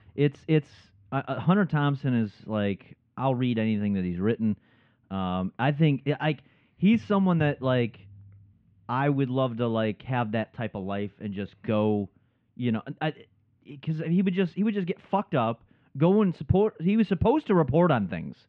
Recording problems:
muffled; very; fading above 3 kHz

